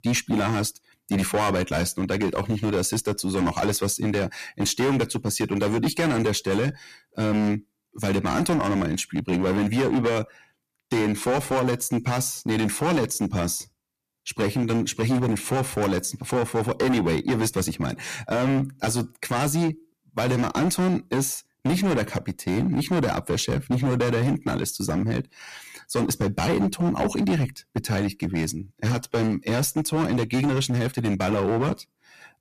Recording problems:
distortion; heavy; 14% of the sound clipped

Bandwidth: 14.5 kHz